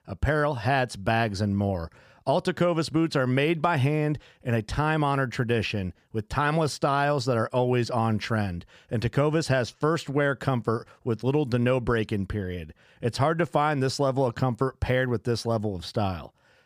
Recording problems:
none

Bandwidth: 15 kHz